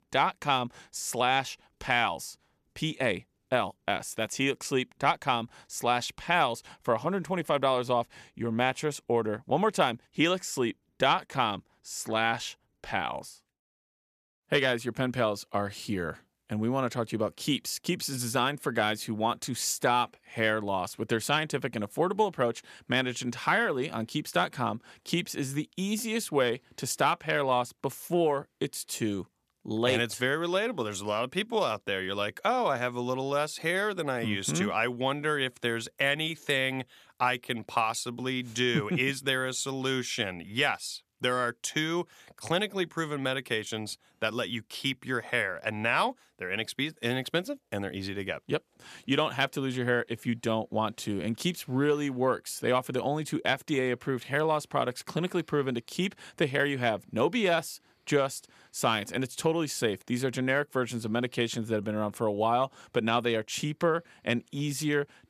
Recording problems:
none

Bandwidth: 14.5 kHz